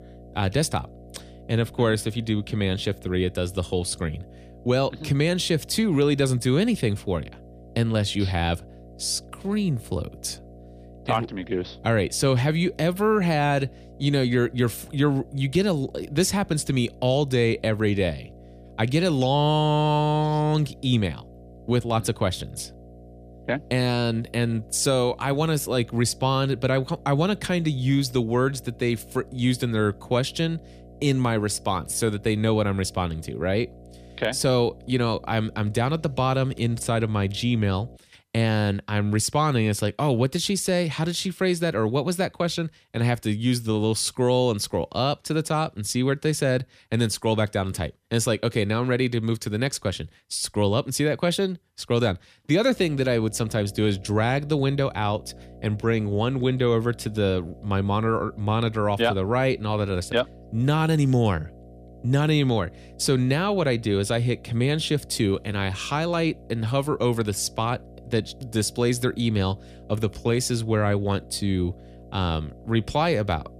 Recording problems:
electrical hum; faint; until 38 s and from 53 s on; 60 Hz, 25 dB below the speech

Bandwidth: 14.5 kHz